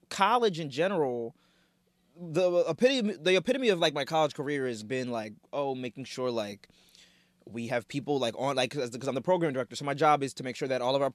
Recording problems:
none

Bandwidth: 13.5 kHz